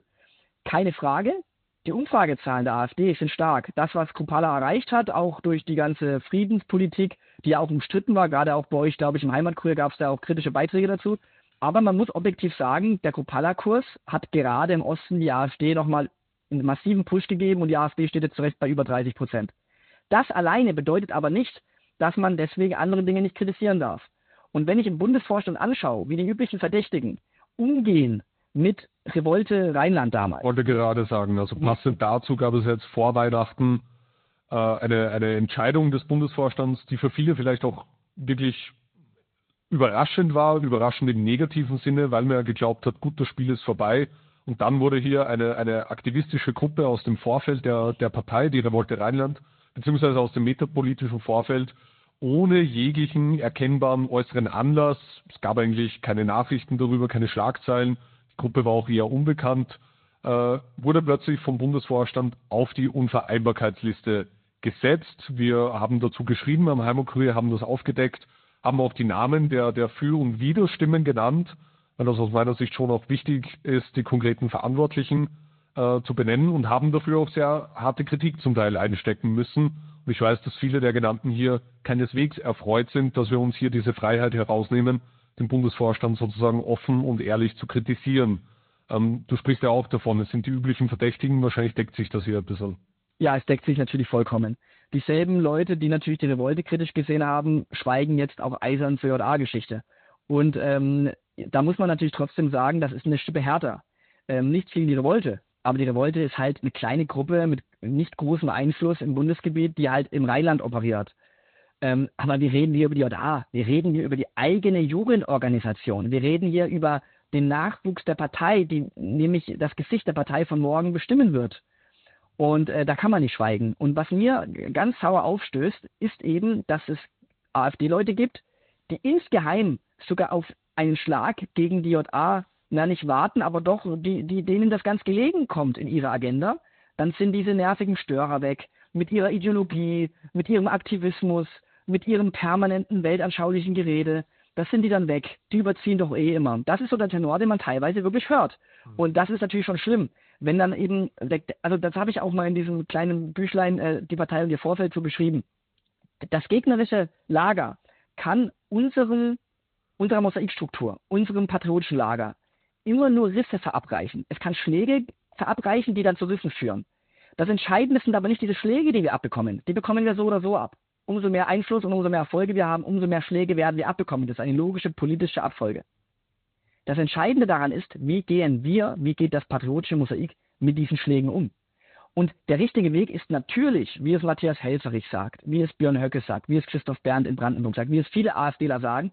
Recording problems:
high frequencies cut off; severe; nothing above 4 kHz
garbled, watery; slightly

